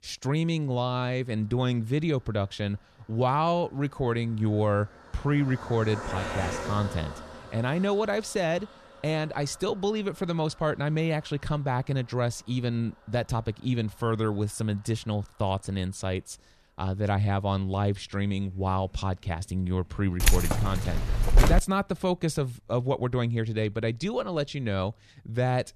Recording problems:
traffic noise; noticeable; throughout; 15 dB below the speech
jangling keys; loud; from 20 to 22 s; peak 6 dB above the speech

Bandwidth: 13.5 kHz